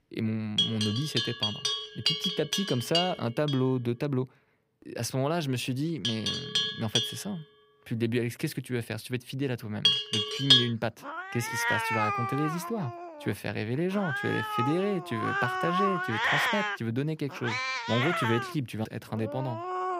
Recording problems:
animal sounds; very loud; throughout; 3 dB above the speech

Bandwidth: 15.5 kHz